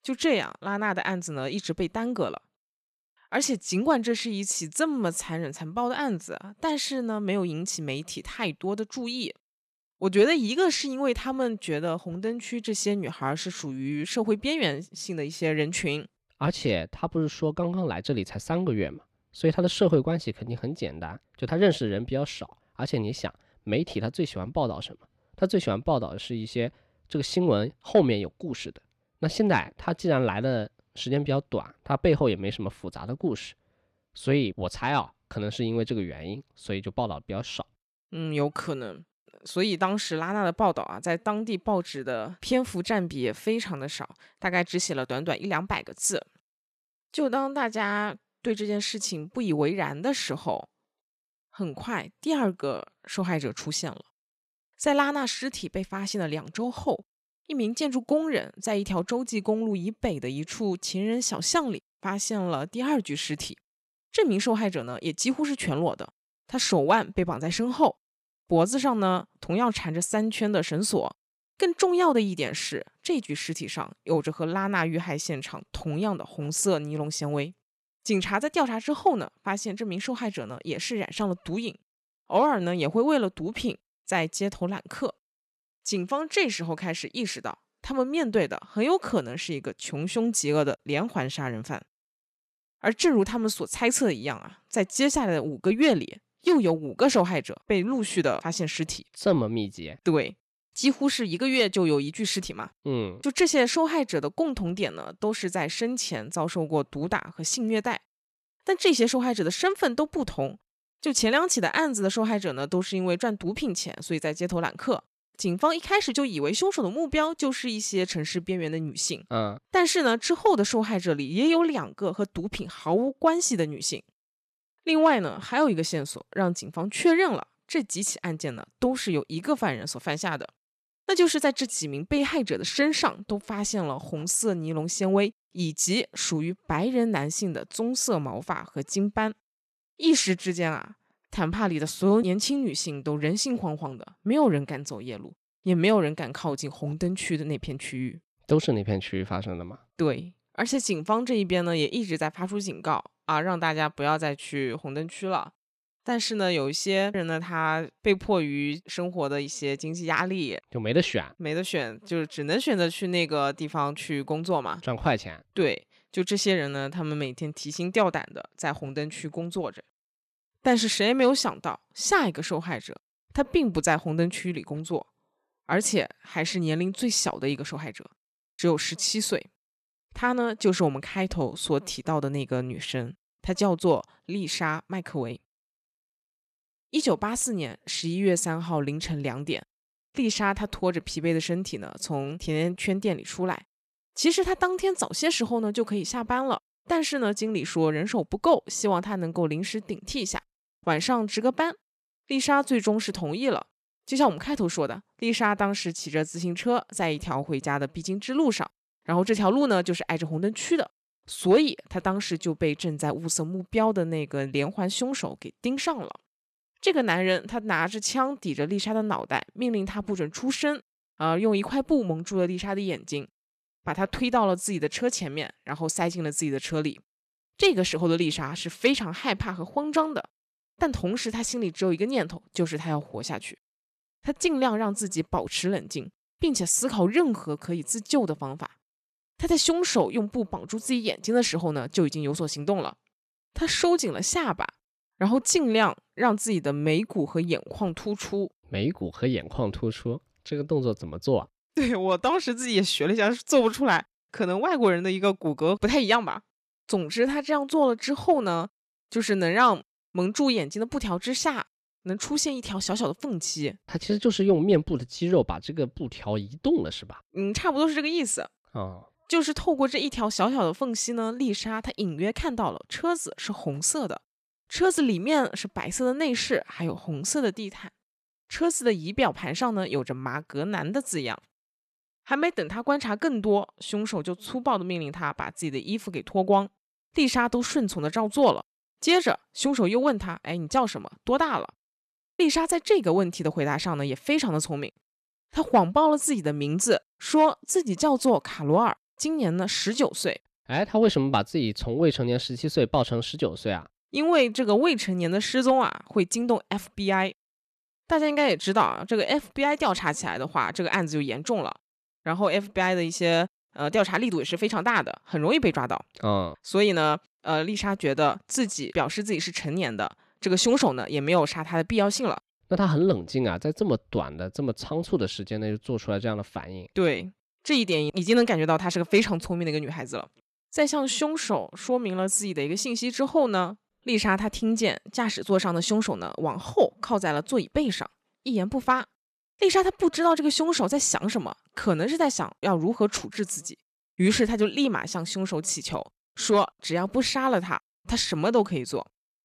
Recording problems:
none

